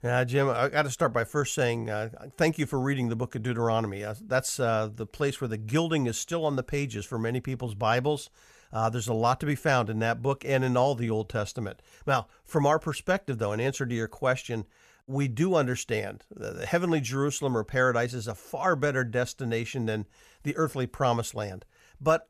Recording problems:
none

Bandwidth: 14.5 kHz